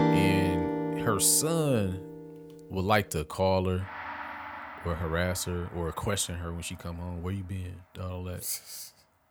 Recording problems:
background music; loud; throughout; 4 dB below the speech

